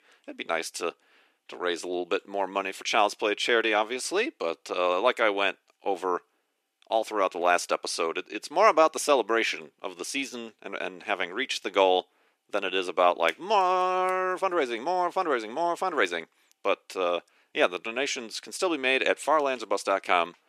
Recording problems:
thin; very slightly; fading below 300 Hz

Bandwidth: 14 kHz